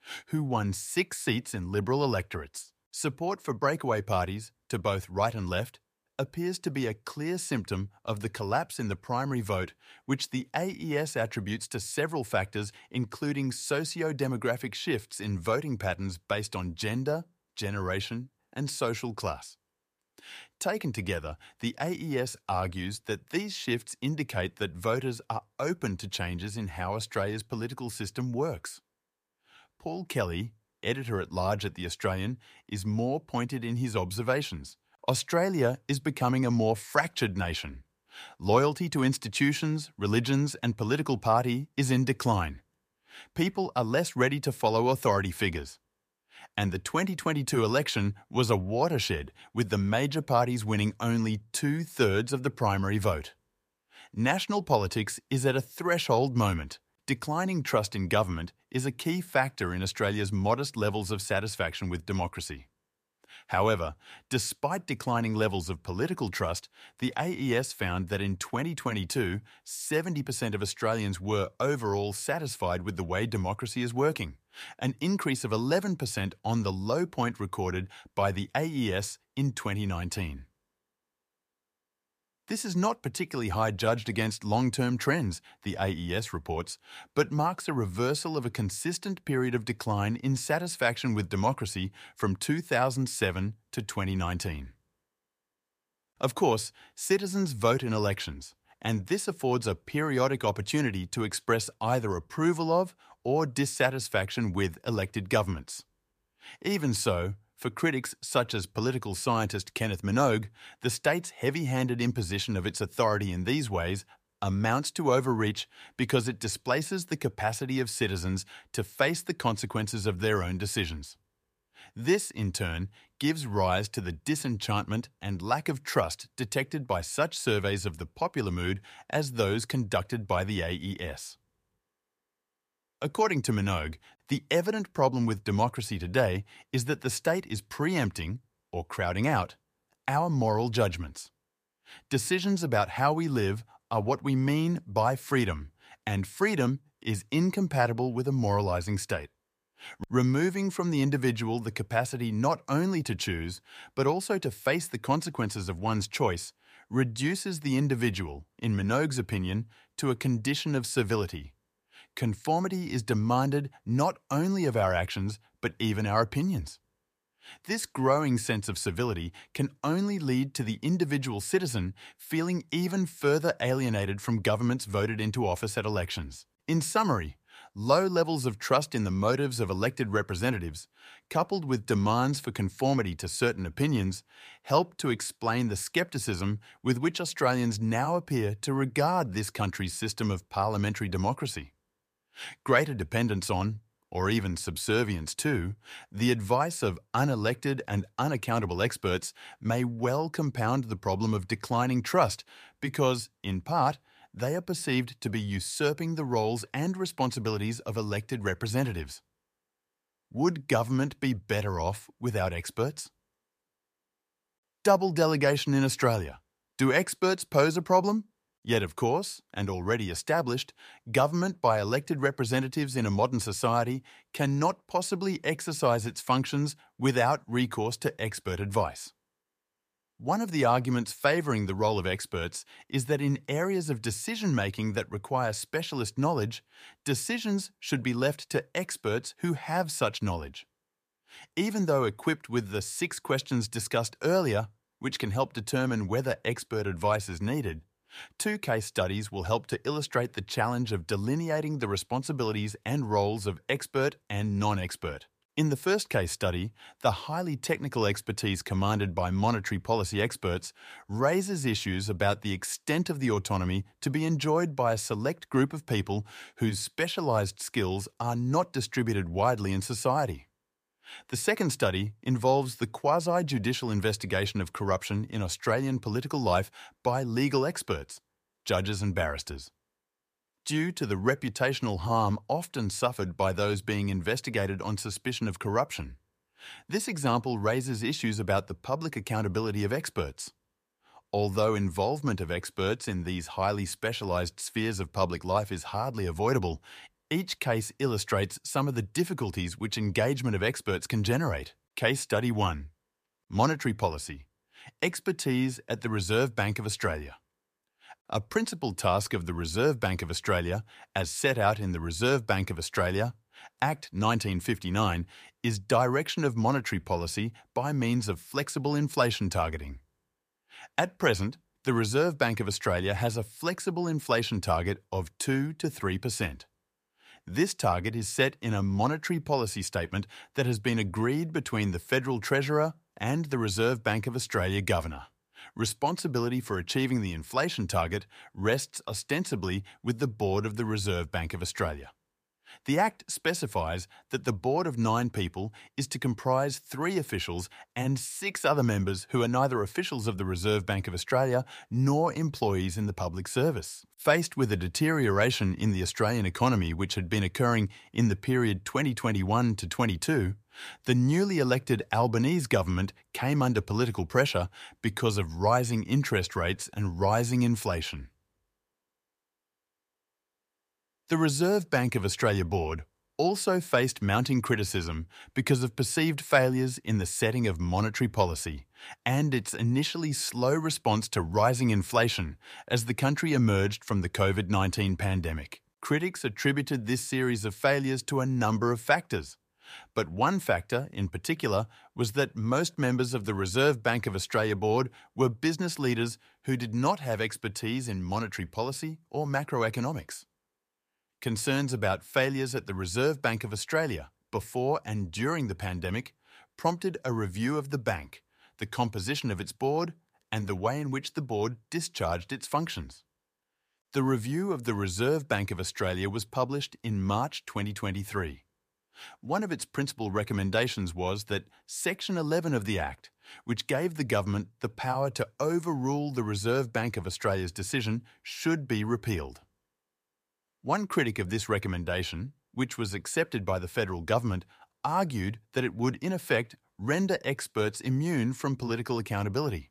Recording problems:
none

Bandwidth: 15 kHz